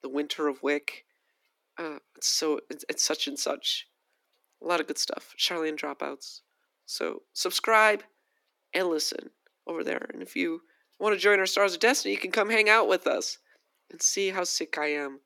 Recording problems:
thin; somewhat; fading below 250 Hz

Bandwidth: 18 kHz